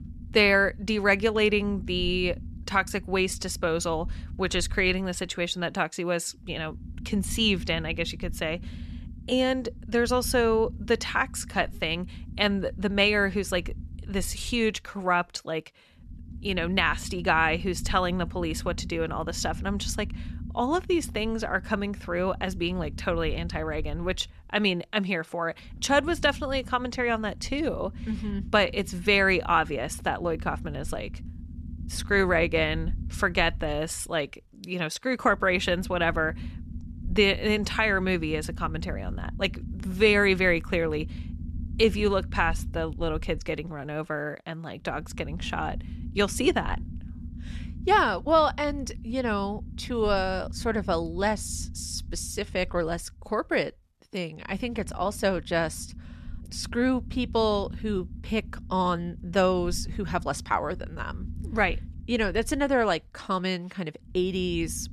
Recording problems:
low rumble; faint; throughout; 25 dB below the speech

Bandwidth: 13.5 kHz